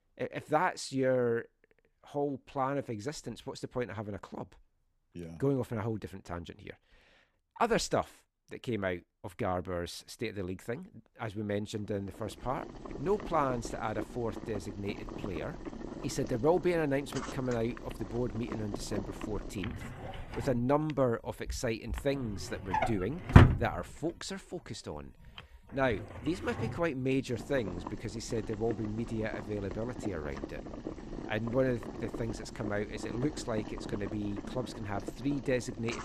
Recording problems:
household noises; loud; from 12 s on; 2 dB below the speech

